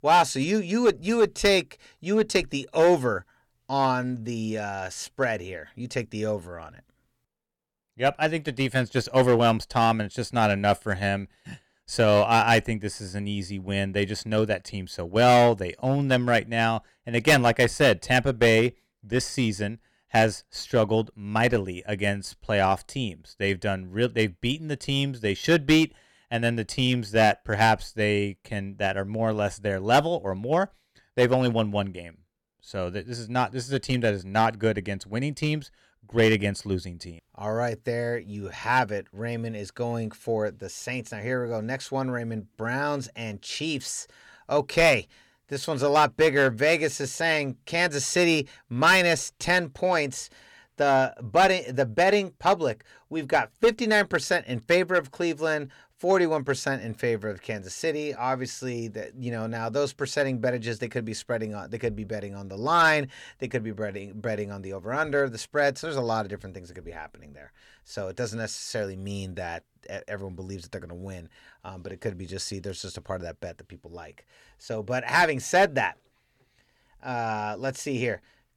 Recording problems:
distortion; slight; 1.9% of the sound clipped

